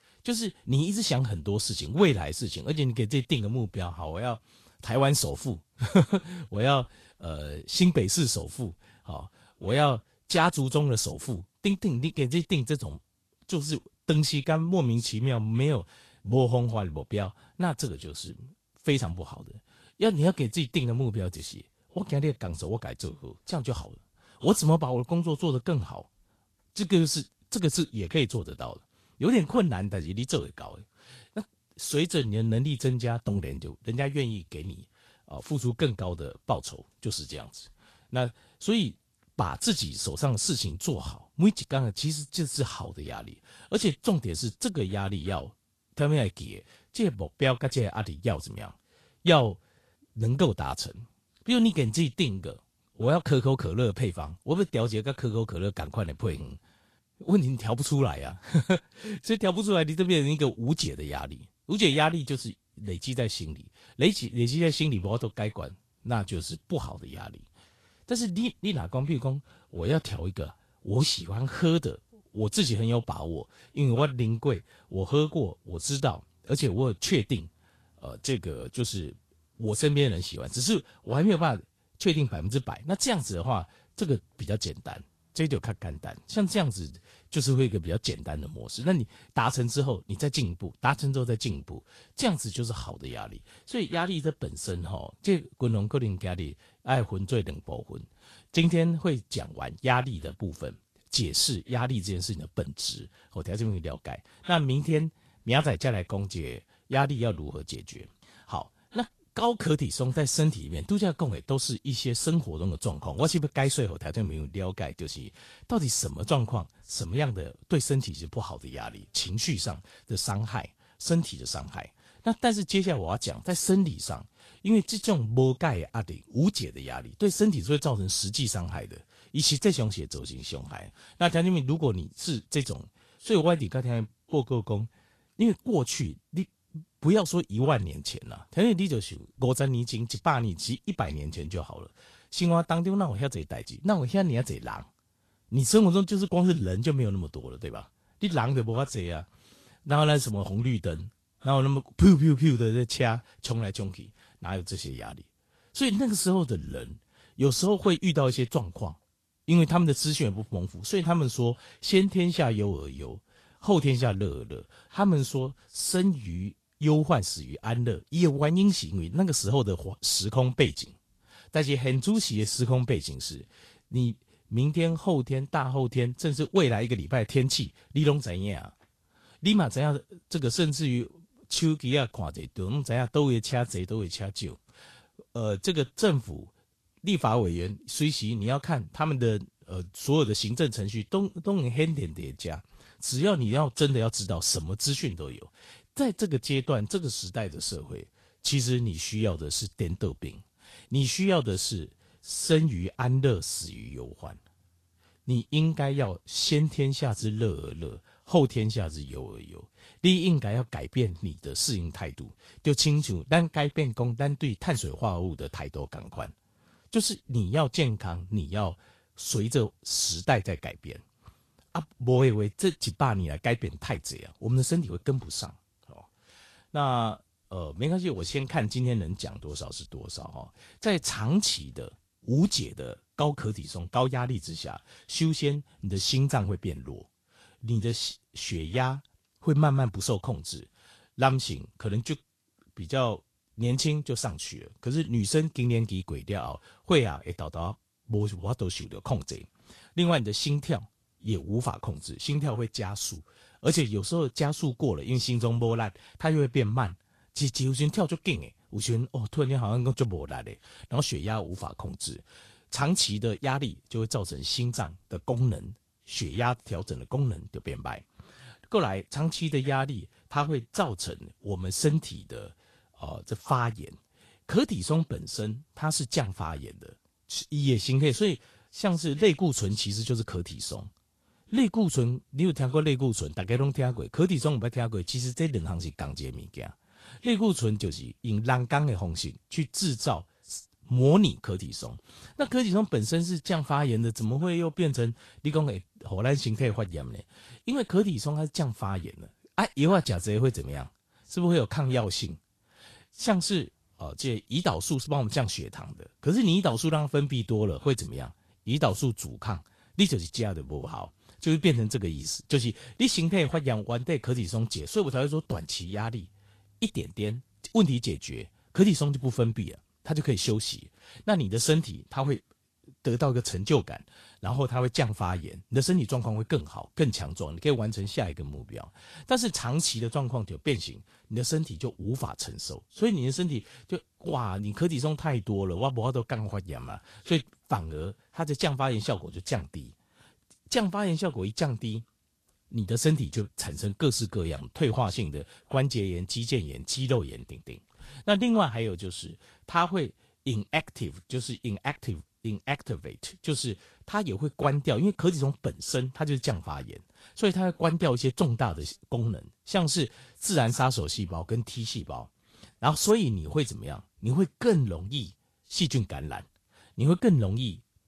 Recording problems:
garbled, watery; slightly; nothing above 12.5 kHz

